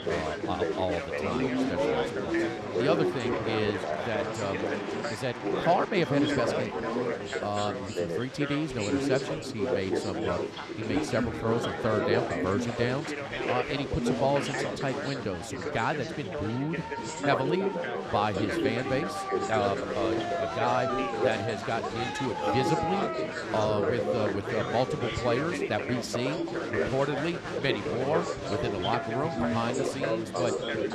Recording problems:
chatter from many people; very loud; throughout; 1 dB above the speech

